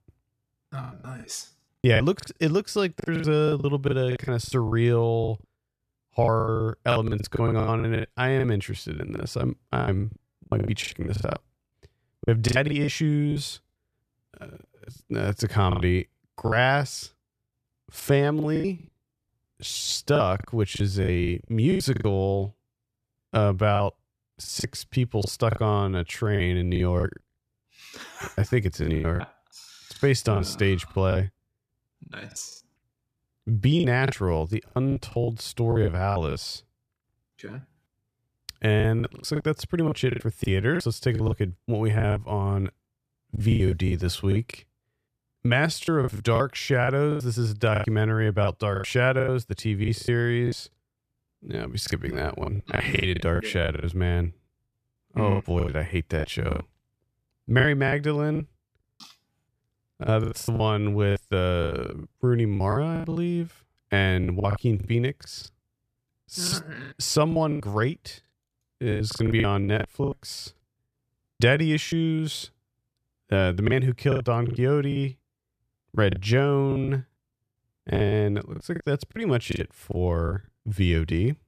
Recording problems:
choppy; very; 15% of the speech affected

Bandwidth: 14.5 kHz